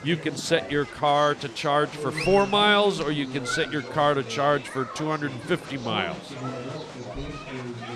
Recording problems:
chatter from many people; loud; throughout; 10 dB below the speech

